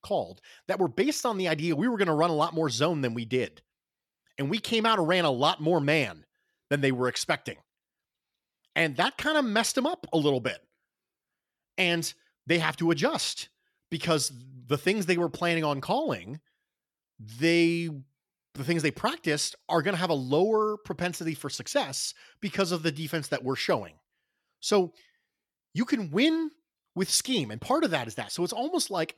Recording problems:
none

